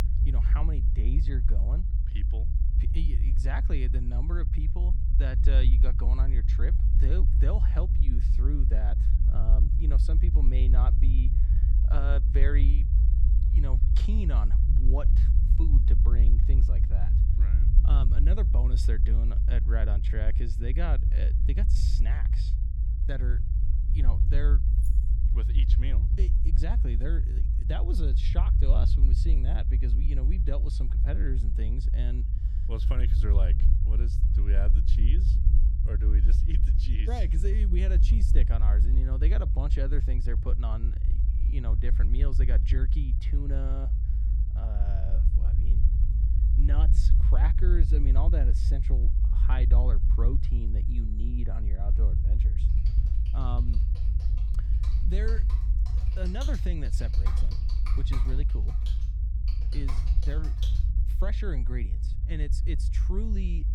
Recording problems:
low rumble; loud; throughout; 4 dB below the speech
jangling keys; faint; at 25 s; peak 15 dB below the speech
keyboard typing; noticeable; from 53 s to 1:01; peak 2 dB below the speech

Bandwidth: 17 kHz